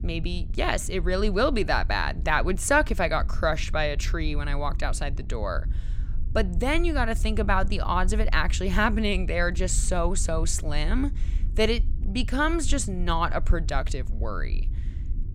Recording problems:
low rumble; faint; throughout; 25 dB below the speech

